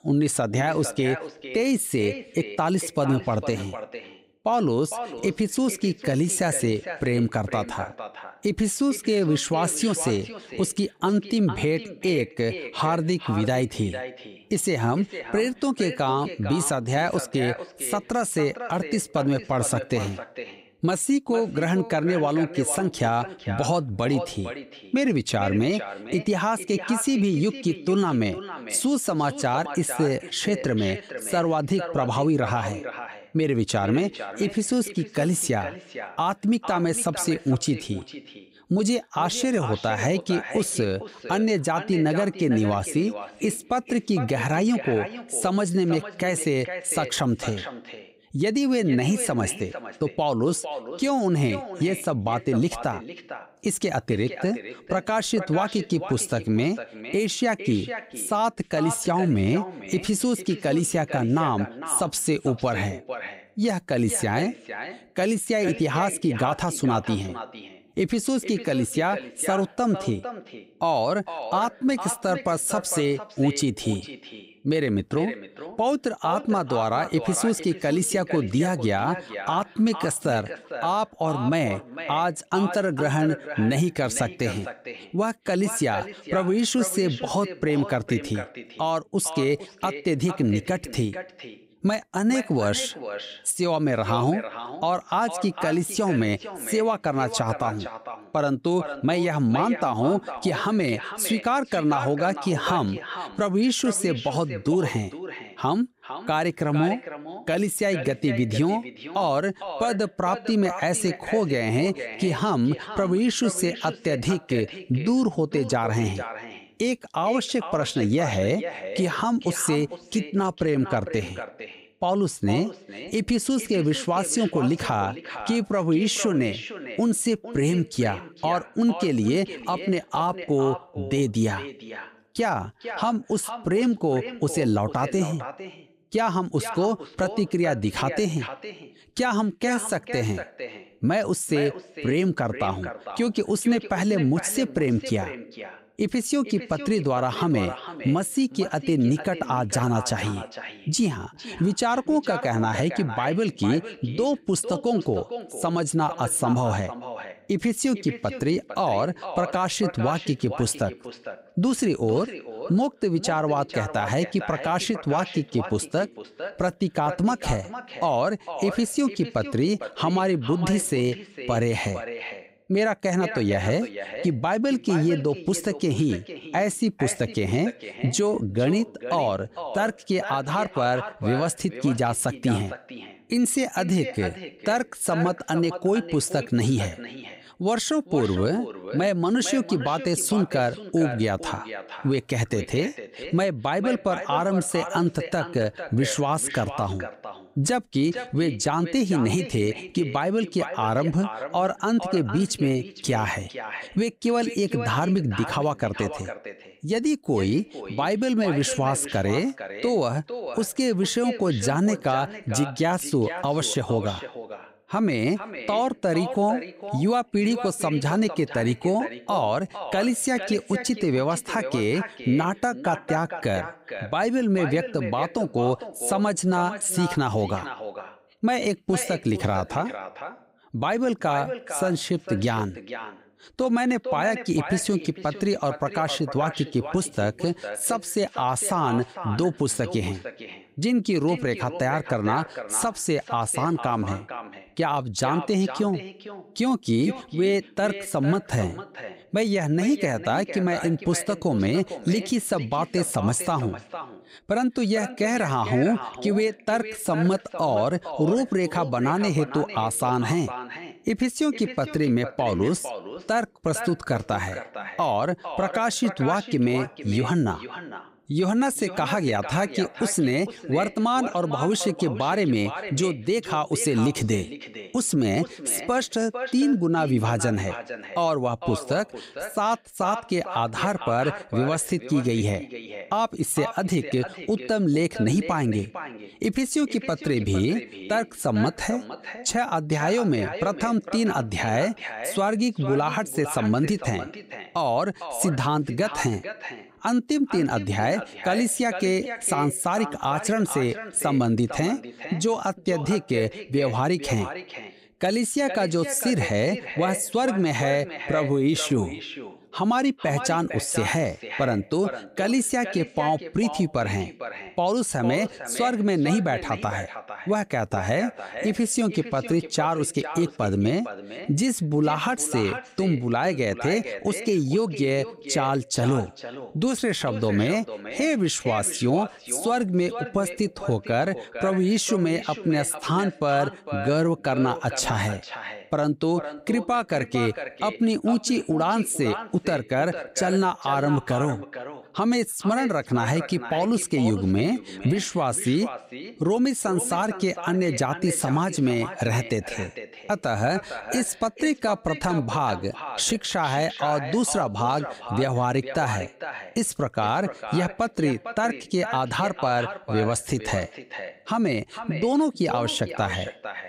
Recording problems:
echo of what is said; strong; throughout; 450 ms later, 10 dB below the speech

